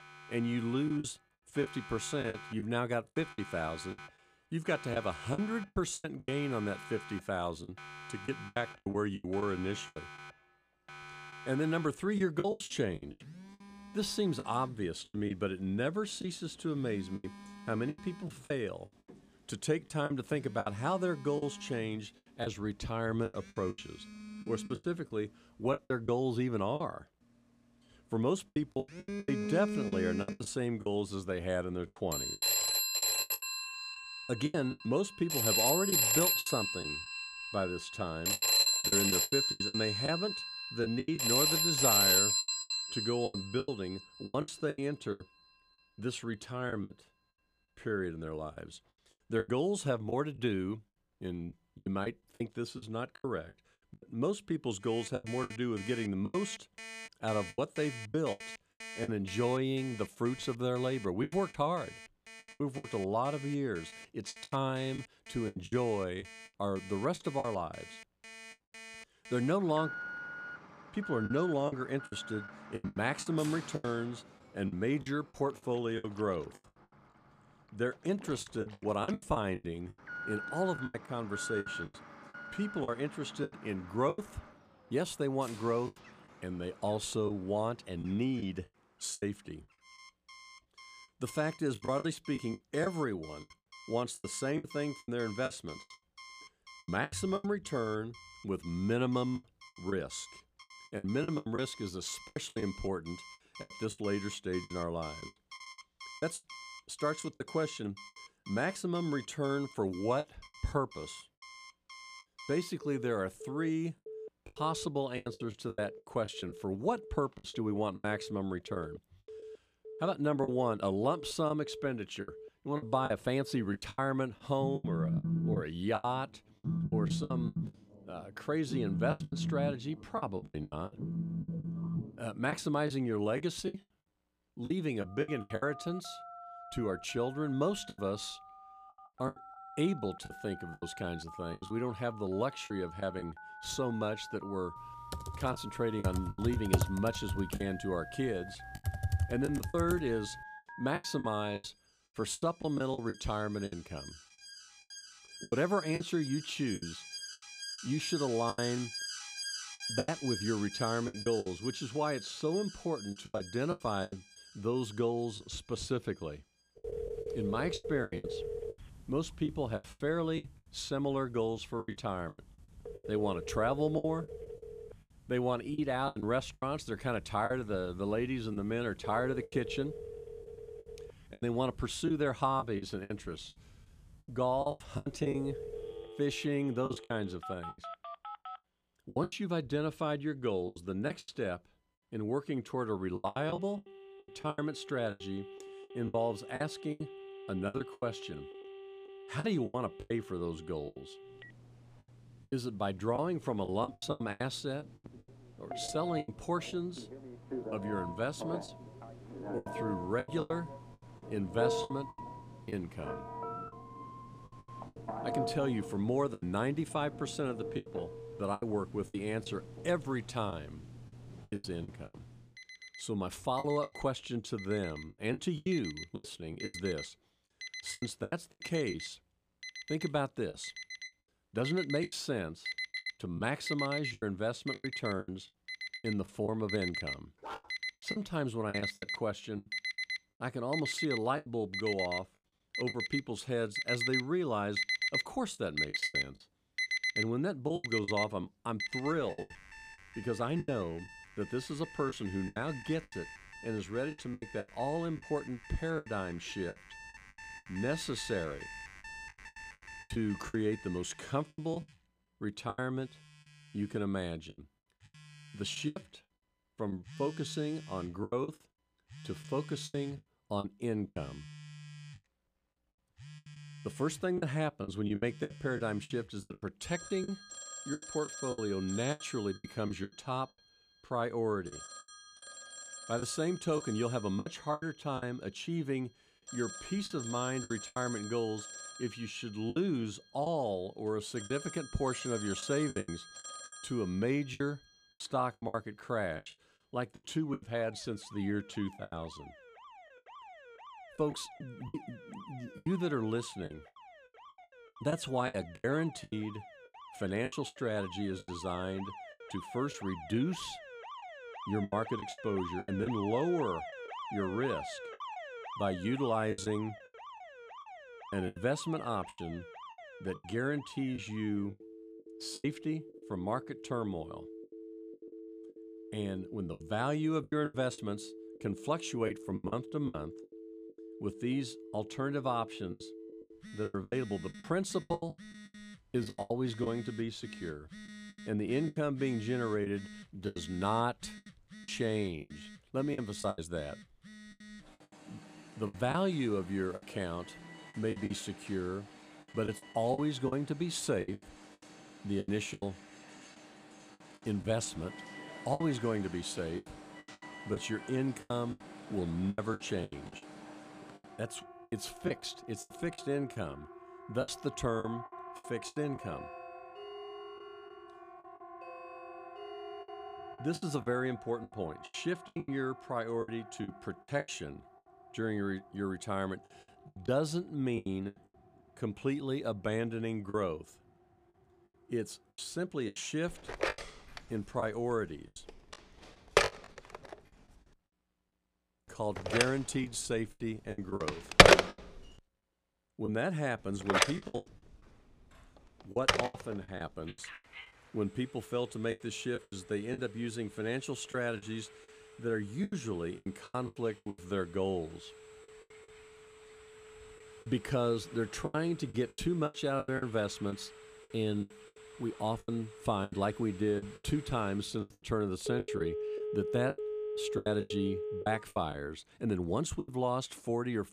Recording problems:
alarms or sirens; loud; throughout; 3 dB below the speech
choppy; very; 11% of the speech affected
keyboard typing; loud; from 2:25 to 2:30; peak 4 dB above the speech
dog barking; noticeable; at 3:57; peak 10 dB below the speech
doorbell; faint; from 6:06 to 6:11; peak 10 dB below the speech

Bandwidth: 14.5 kHz